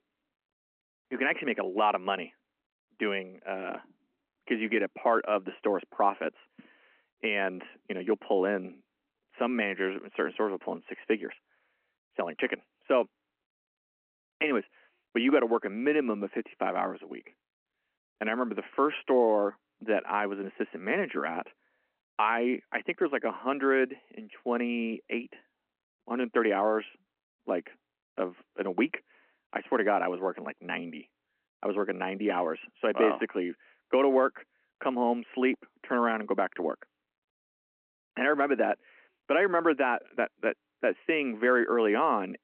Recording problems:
phone-call audio

